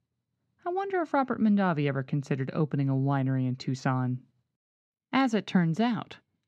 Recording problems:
none

